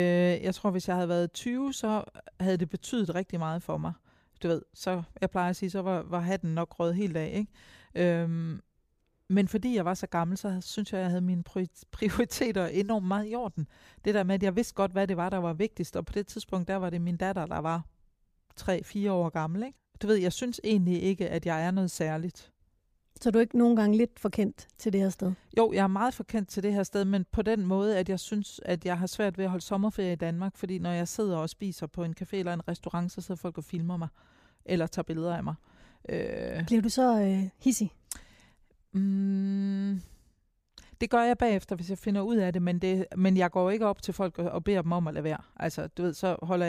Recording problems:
abrupt cut into speech; at the start and the end

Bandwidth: 15 kHz